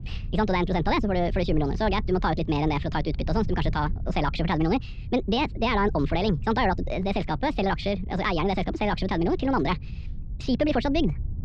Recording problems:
wrong speed and pitch; too fast and too high; 1.5 times normal speed
muffled; very slightly; fading above 4 kHz
low rumble; faint; throughout; 25 dB below the speech

